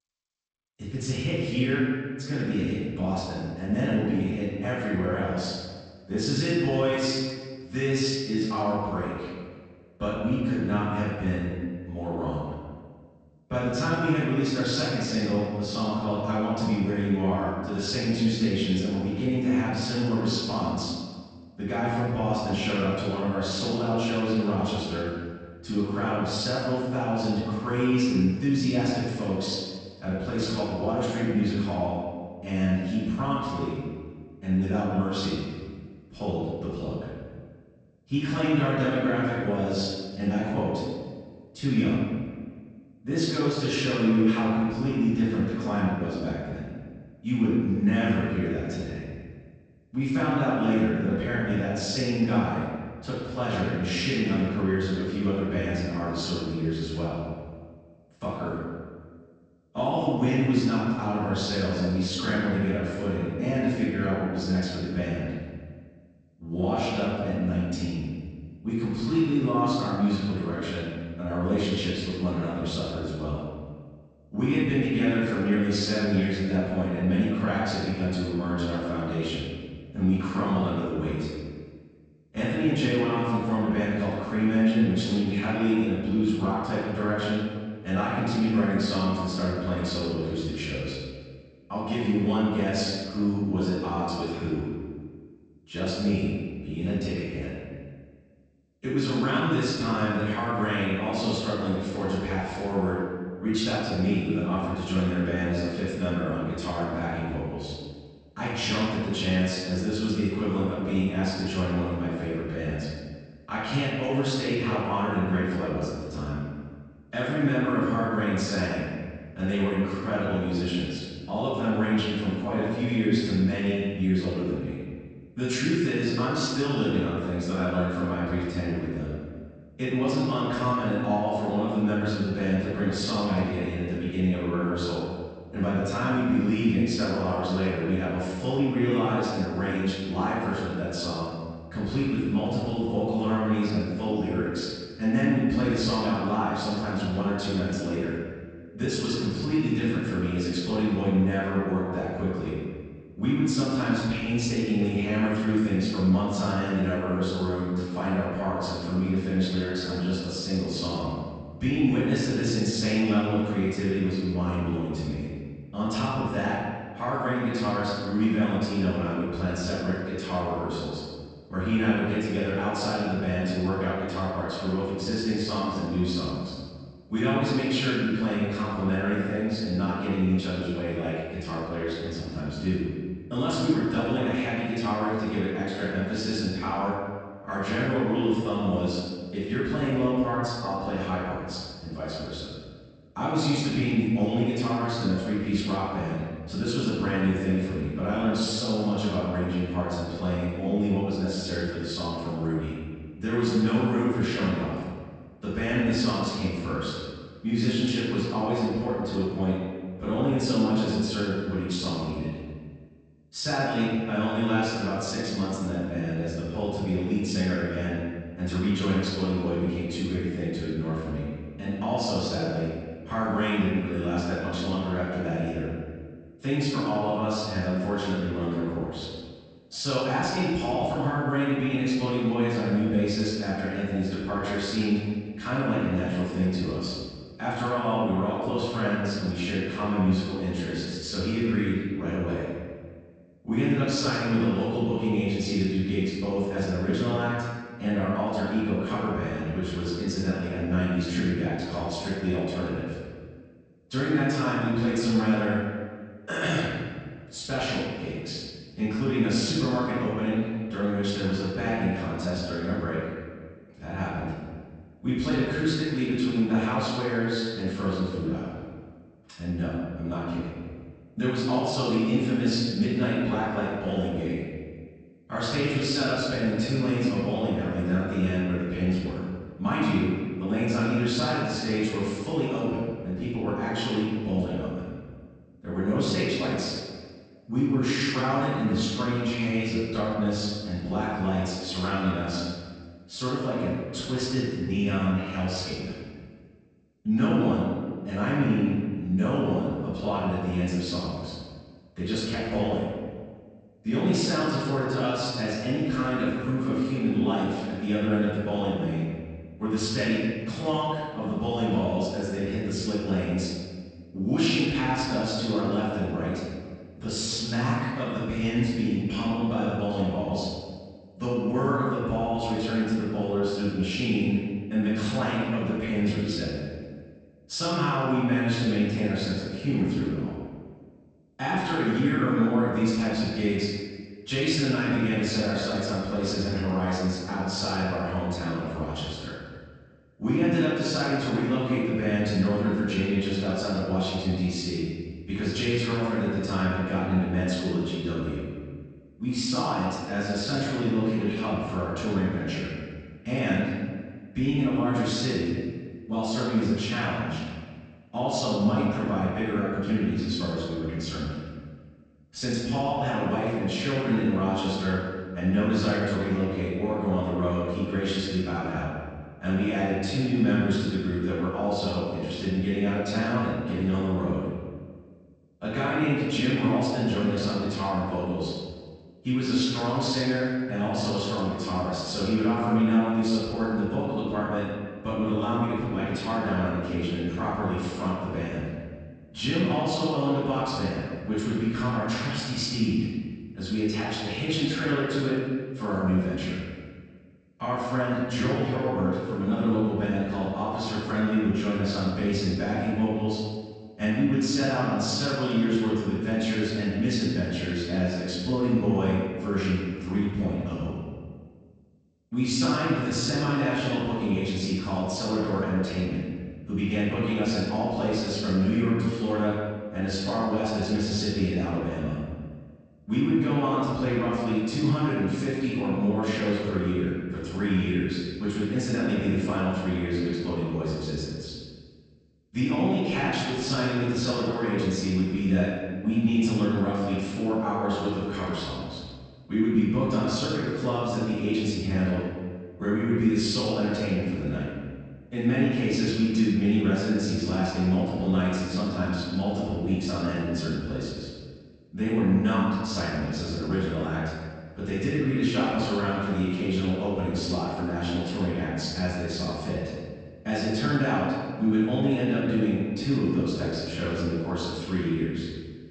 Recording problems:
room echo; strong; dies away in 1.5 s
off-mic speech; far
garbled, watery; slightly; nothing above 8 kHz

